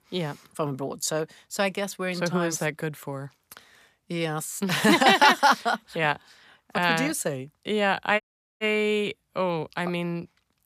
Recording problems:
audio cutting out; at 8 s

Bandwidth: 14.5 kHz